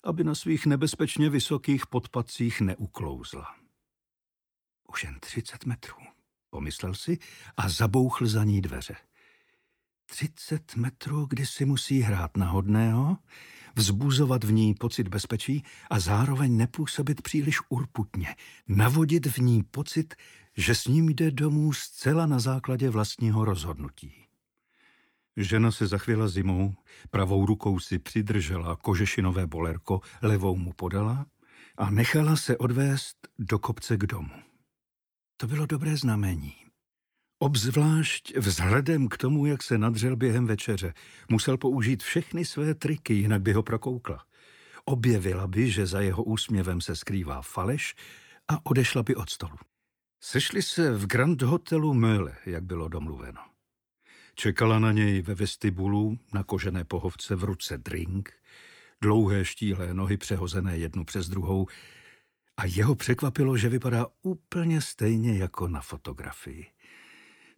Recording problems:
none

